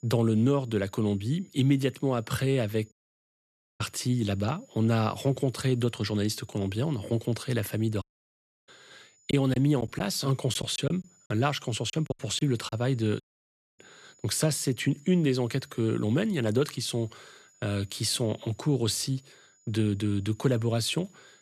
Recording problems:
high-pitched whine; faint; throughout; 7 kHz, 30 dB below the speech
audio cutting out; at 3 s for 1 s, at 8 s for 0.5 s and at 13 s for 0.5 s
choppy; very; from 9.5 to 13 s; 9% of the speech affected

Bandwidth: 13.5 kHz